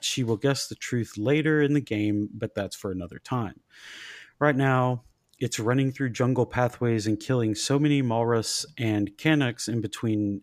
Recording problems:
none

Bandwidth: 14.5 kHz